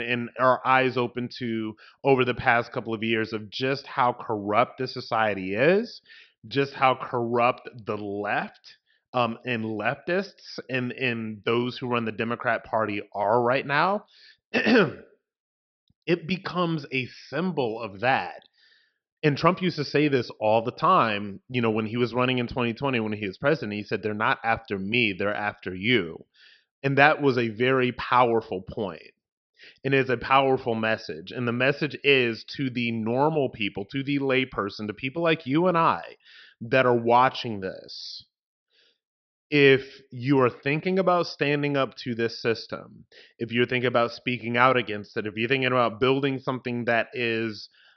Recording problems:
high frequencies cut off; noticeable; nothing above 5.5 kHz
abrupt cut into speech; at the start

